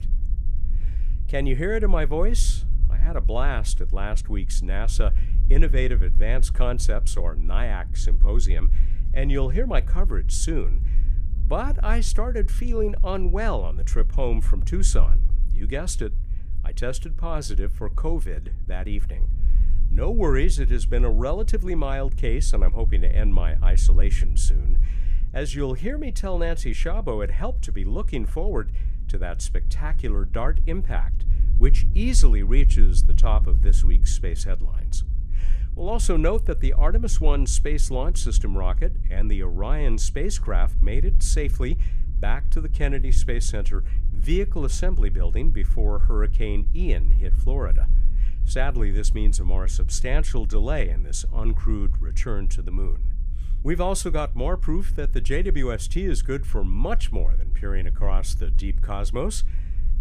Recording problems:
low rumble; noticeable; throughout; 15 dB below the speech

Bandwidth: 15 kHz